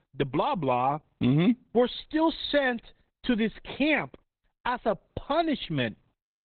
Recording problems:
garbled, watery; badly; nothing above 4 kHz

